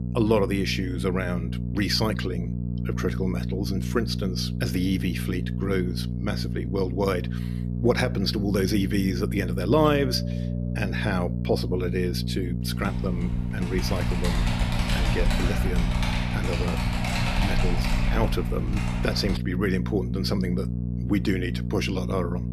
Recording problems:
electrical hum; loud; throughout; 60 Hz, 10 dB below the speech
doorbell; faint; from 10 to 11 s; peak 10 dB below the speech
keyboard typing; loud; from 13 to 19 s; peak 2 dB above the speech

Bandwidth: 13.5 kHz